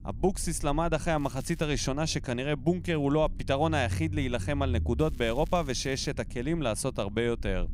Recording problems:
low rumble; faint; throughout; 25 dB below the speech
crackling; faint; at 1 s and from 5 to 6 s; 25 dB below the speech

